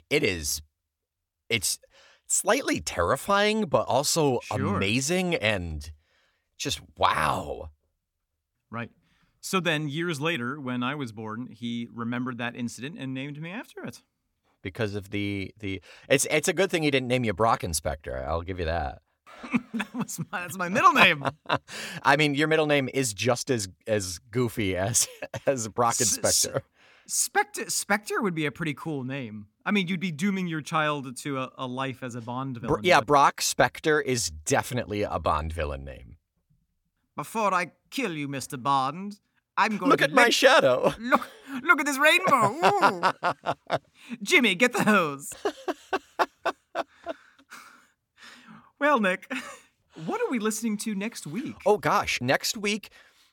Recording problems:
none

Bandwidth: 17.5 kHz